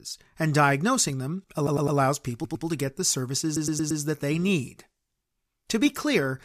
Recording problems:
audio stuttering; at 1.5 s, at 2.5 s and at 3.5 s

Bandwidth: 14.5 kHz